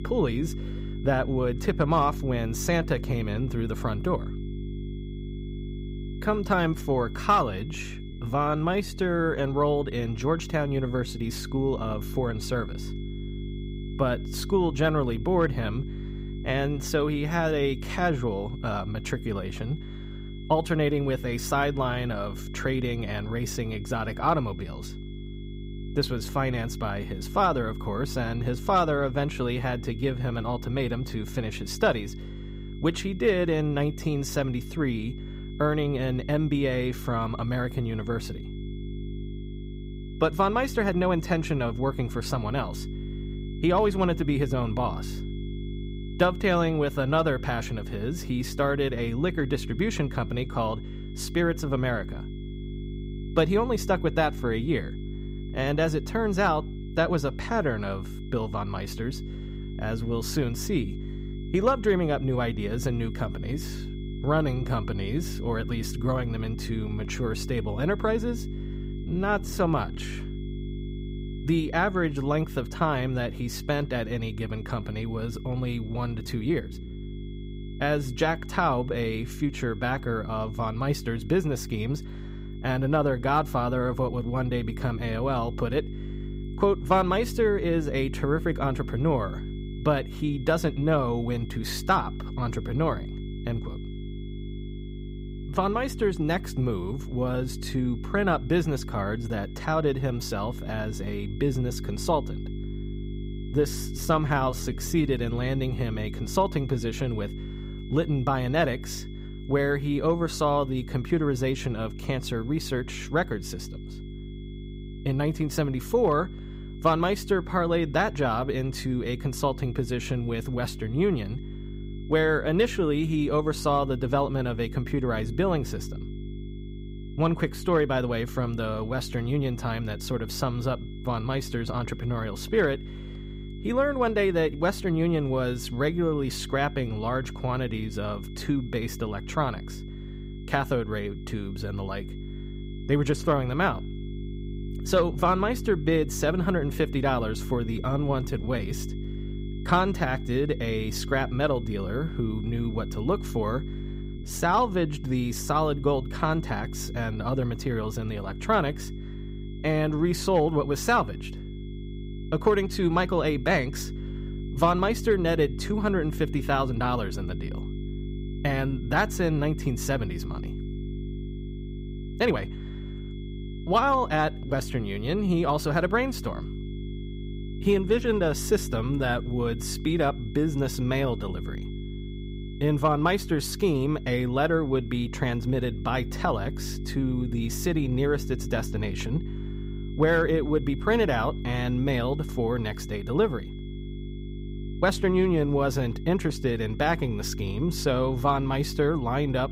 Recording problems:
electrical hum; noticeable; throughout; 50 Hz, 15 dB below the speech
high-pitched whine; faint; throughout; 3.5 kHz, 25 dB below the speech
uneven, jittery; strongly; from 8 s to 2:52

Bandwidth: 15.5 kHz